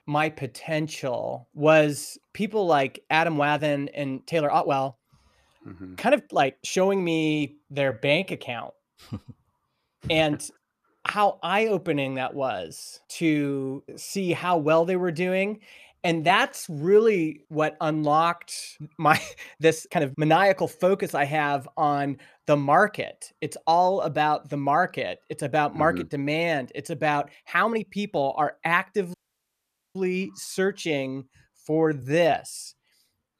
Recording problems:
uneven, jittery; strongly; from 3 to 32 s
audio cutting out; at 29 s for 1 s

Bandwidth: 14.5 kHz